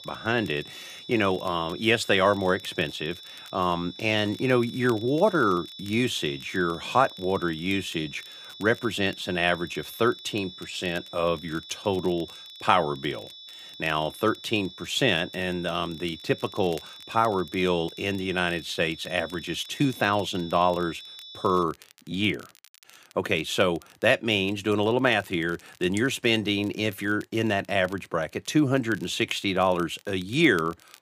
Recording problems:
high-pitched whine; noticeable; until 22 s; 3.5 kHz, 15 dB below the speech
crackle, like an old record; faint; 25 dB below the speech

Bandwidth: 15 kHz